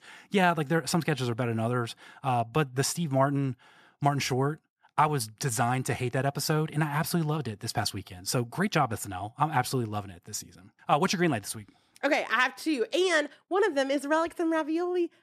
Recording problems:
none

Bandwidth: 14 kHz